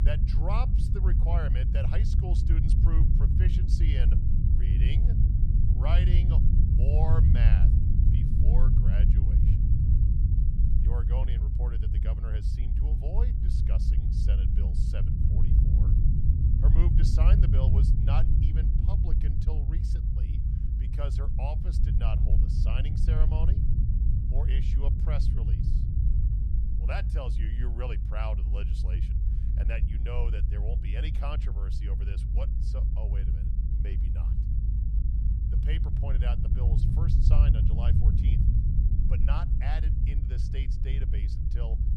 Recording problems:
low rumble; loud; throughout; 1 dB below the speech

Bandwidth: 15 kHz